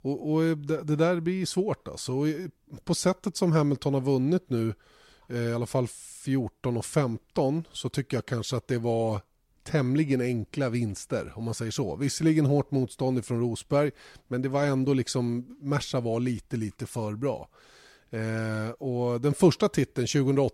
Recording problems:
none

